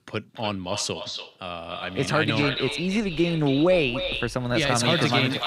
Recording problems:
echo of what is said; strong; throughout; 290 ms later, 8 dB below the speech
rain or running water; faint; from 2 s on; 25 dB below the speech

